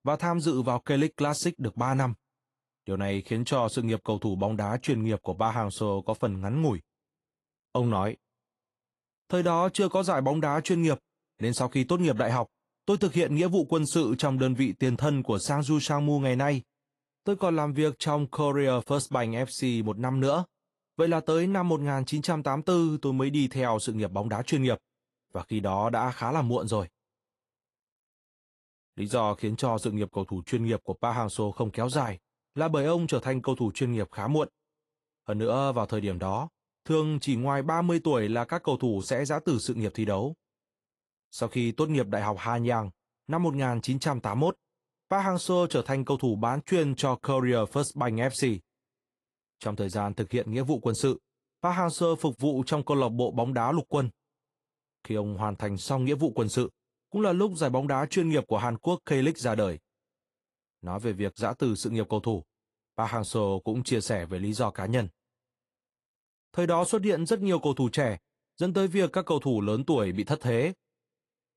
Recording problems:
garbled, watery; slightly; nothing above 11 kHz

